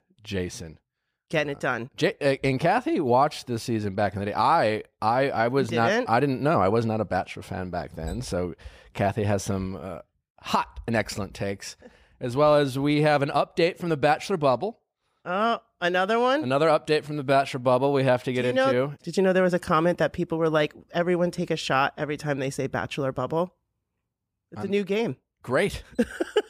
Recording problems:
none

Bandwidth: 15 kHz